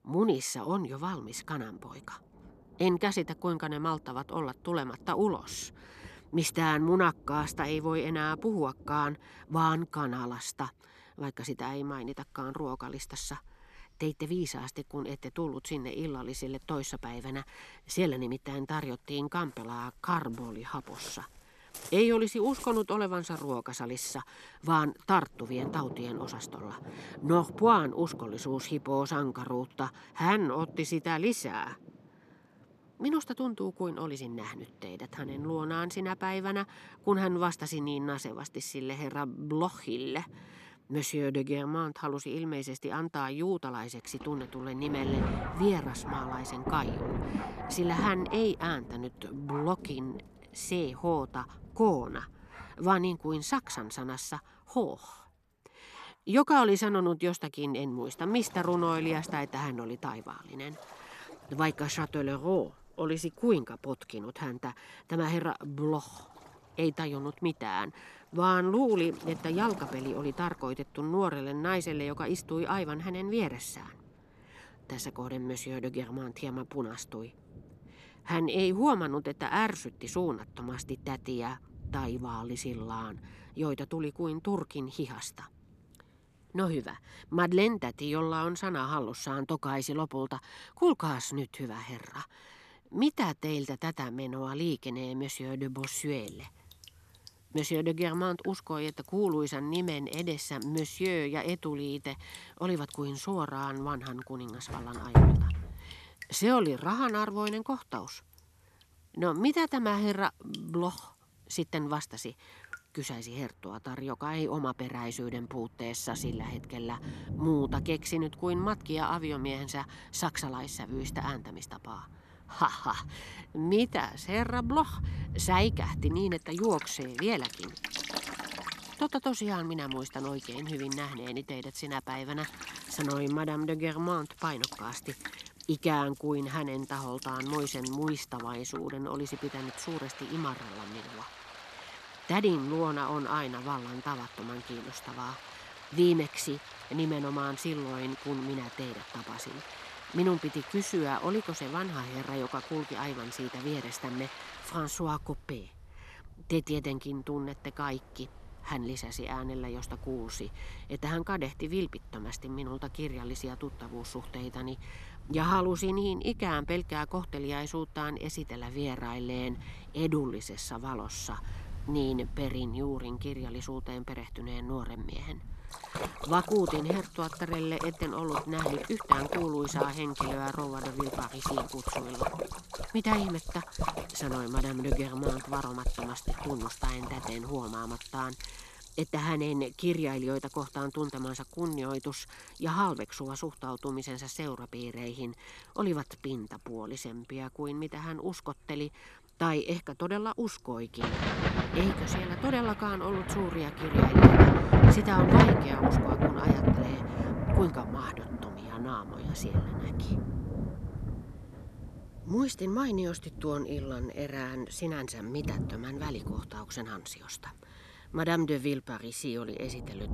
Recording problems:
rain or running water; loud; throughout; as loud as the speech

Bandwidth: 13.5 kHz